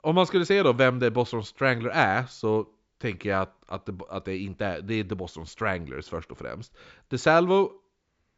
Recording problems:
high frequencies cut off; noticeable; nothing above 8 kHz

